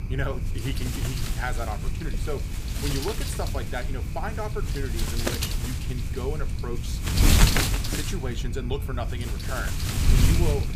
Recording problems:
wind noise on the microphone; heavy; 3 dB above the speech

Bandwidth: 15 kHz